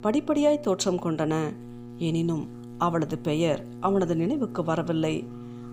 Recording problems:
electrical hum; noticeable; throughout; 60 Hz, 20 dB below the speech

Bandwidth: 15 kHz